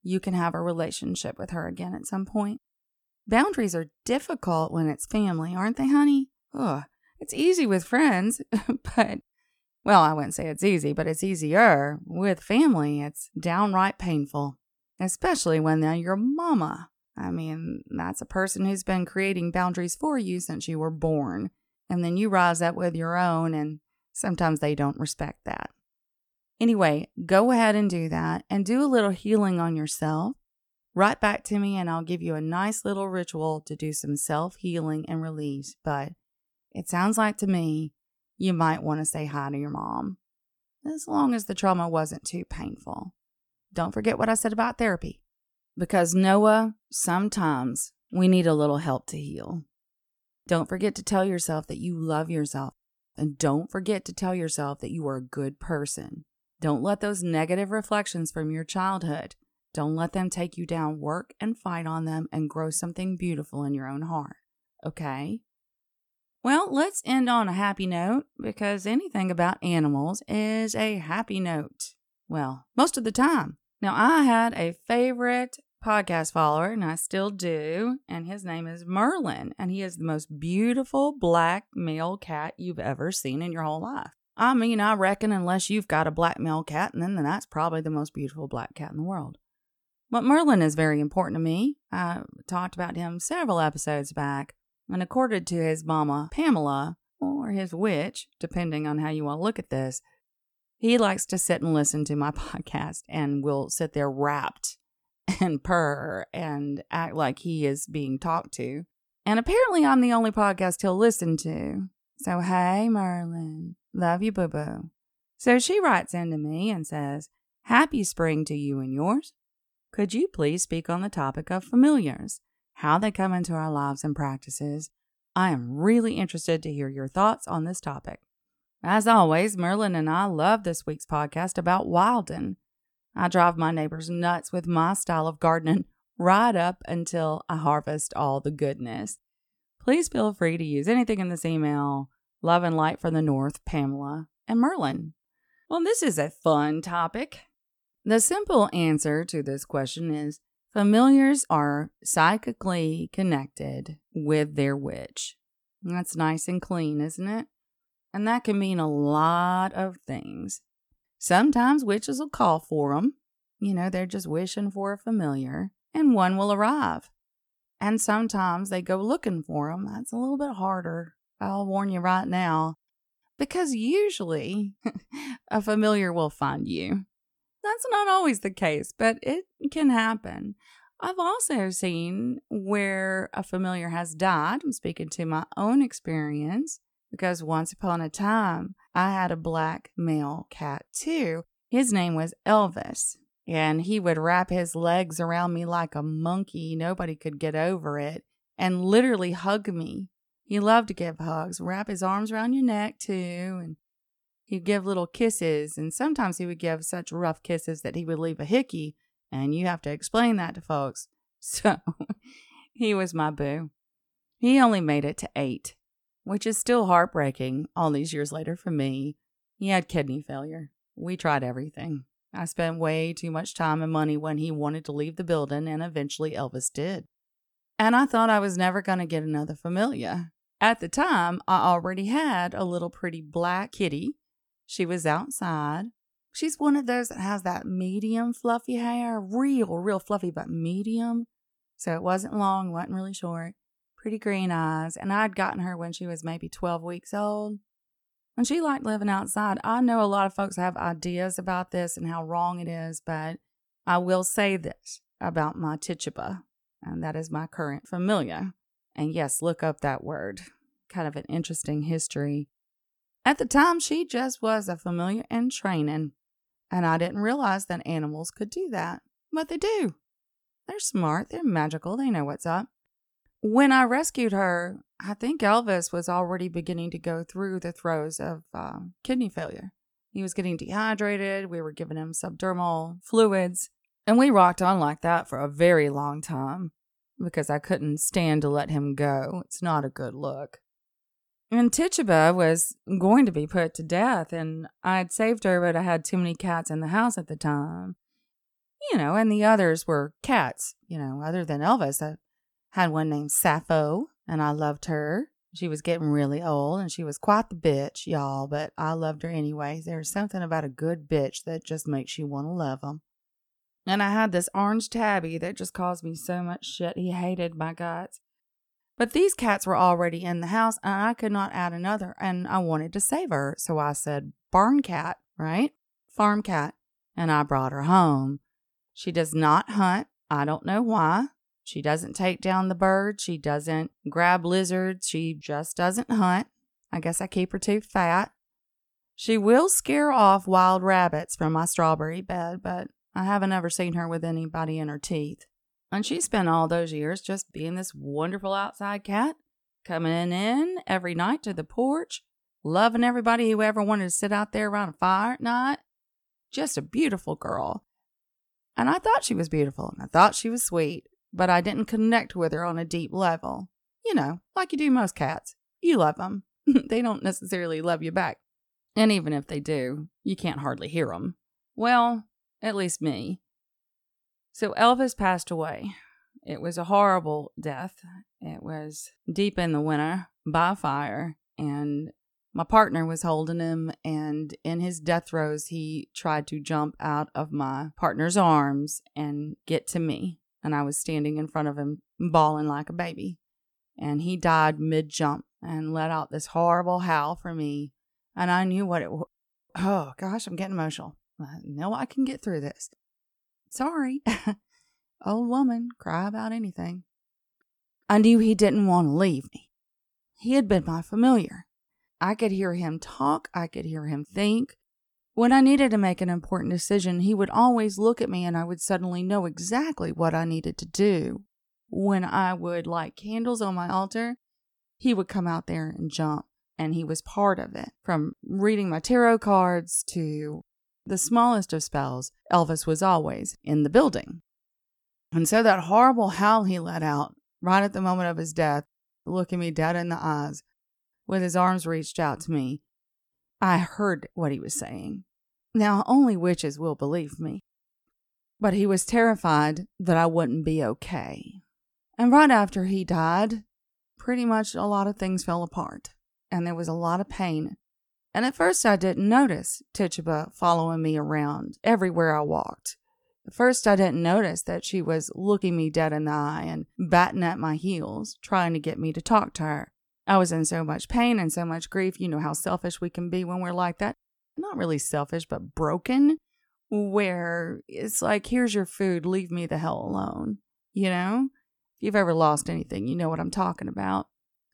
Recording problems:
none

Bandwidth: 18.5 kHz